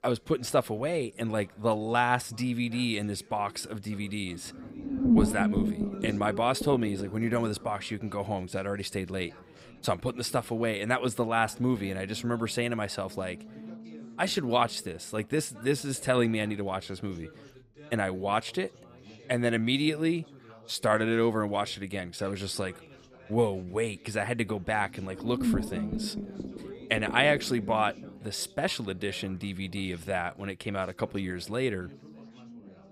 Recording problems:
low rumble; loud; throughout; 9 dB below the speech
background chatter; faint; throughout; 3 voices, 25 dB below the speech

